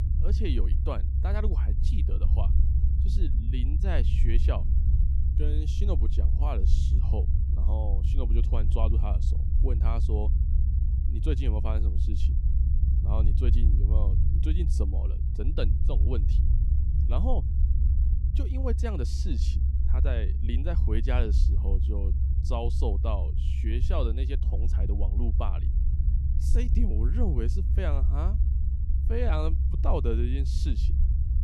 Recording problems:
low rumble; loud; throughout; 6 dB below the speech

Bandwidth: 14.5 kHz